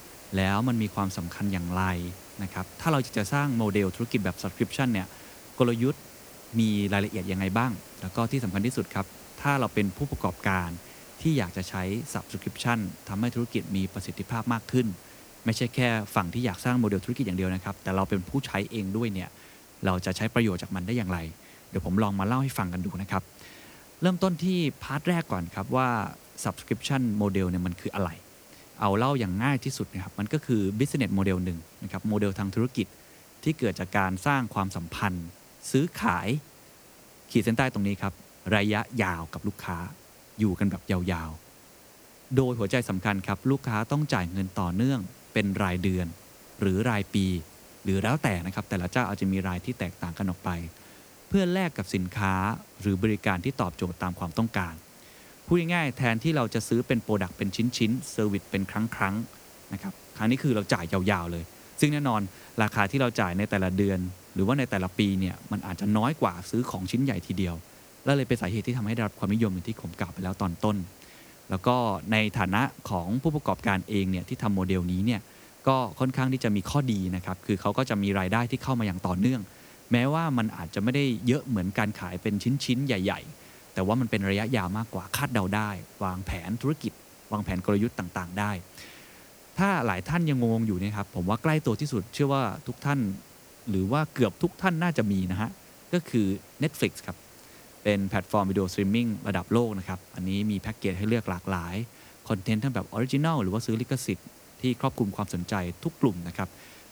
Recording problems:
hiss; faint; throughout; 20 dB below the speech

